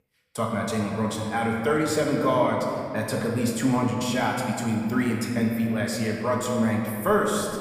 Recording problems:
room echo; noticeable; dies away in 2.4 s
off-mic speech; somewhat distant

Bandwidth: 15 kHz